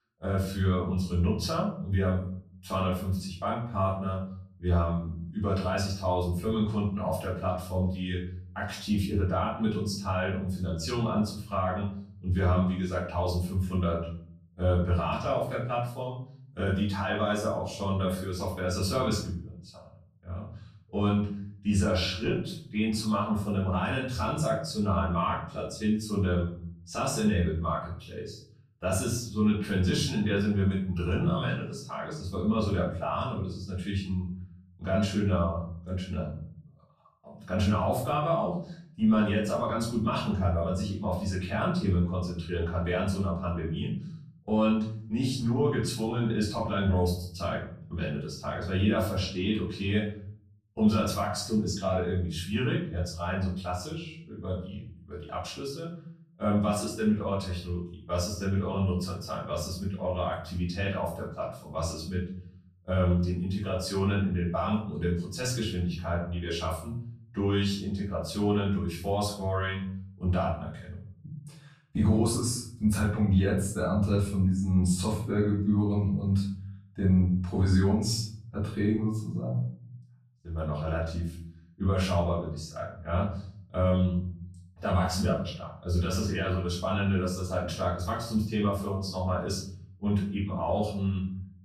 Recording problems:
off-mic speech; far
room echo; noticeable; dies away in 0.7 s

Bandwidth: 14.5 kHz